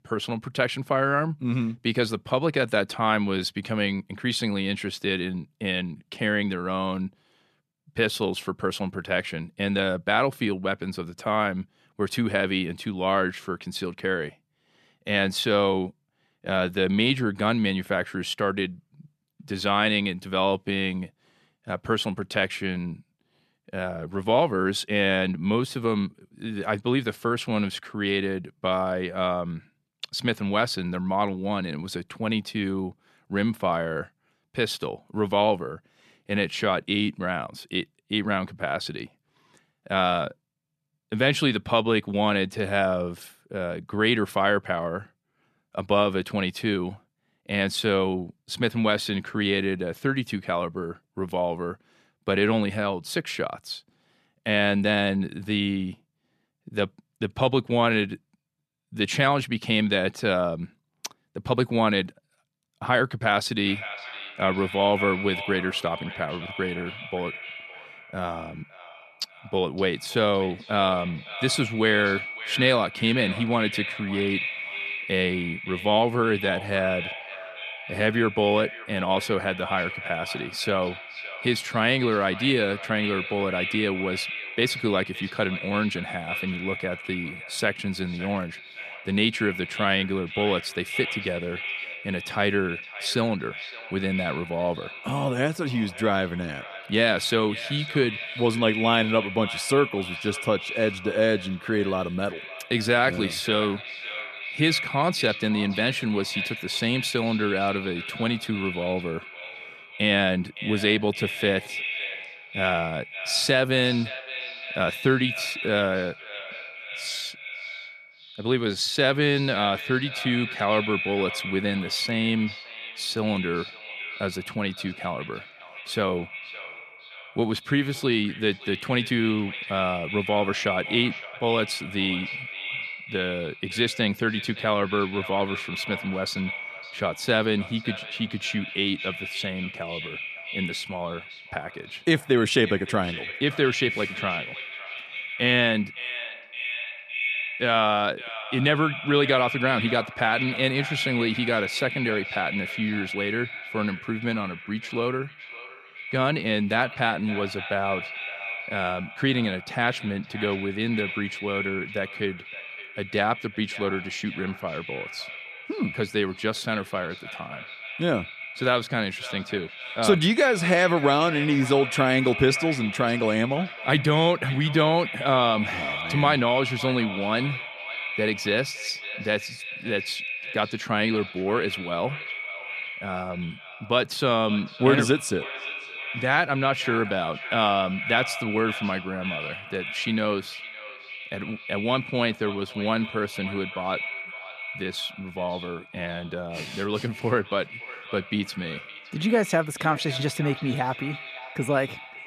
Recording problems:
echo of what is said; strong; from 1:04 on; 560 ms later, 8 dB below the speech

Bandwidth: 14 kHz